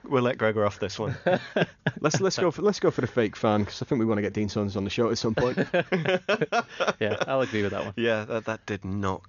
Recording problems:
high frequencies cut off; noticeable; nothing above 7 kHz

